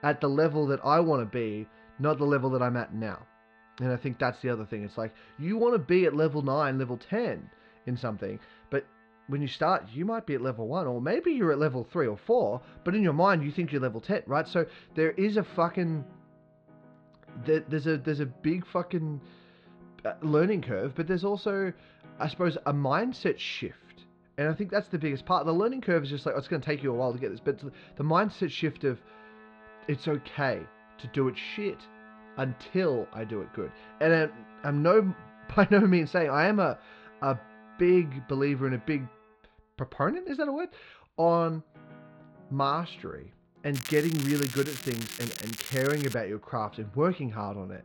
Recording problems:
muffled; slightly; fading above 4 kHz
crackling; loud; from 44 to 46 s; 9 dB below the speech
background music; faint; throughout; 25 dB below the speech

